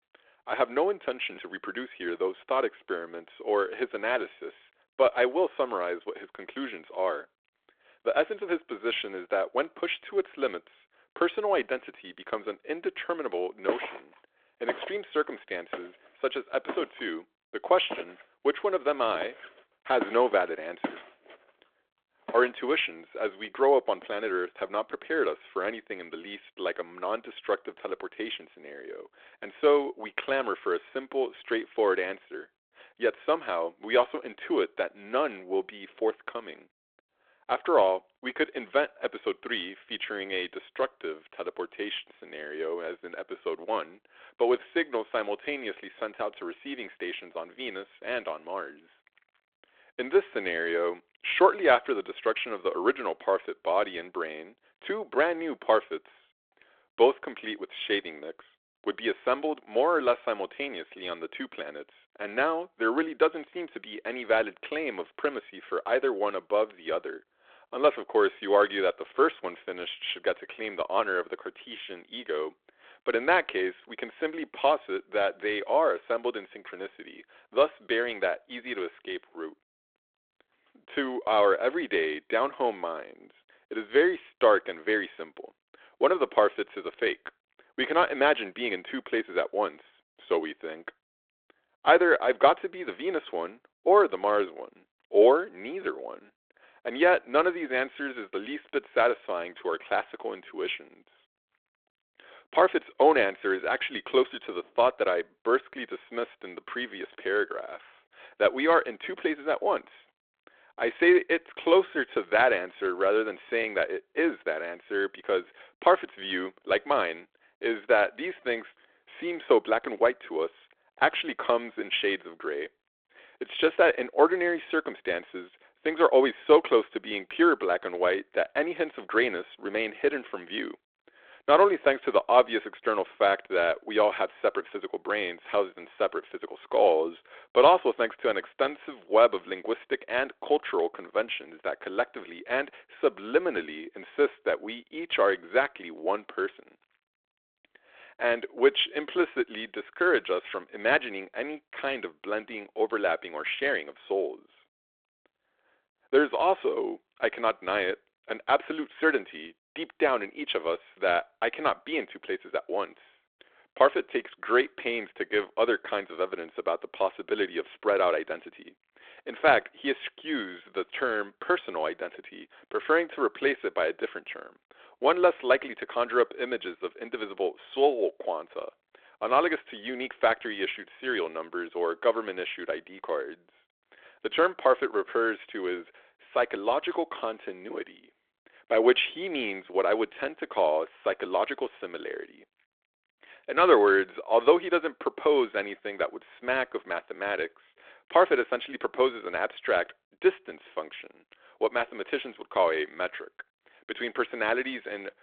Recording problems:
phone-call audio
footsteps; noticeable; from 14 to 22 s; peak 5 dB below the speech

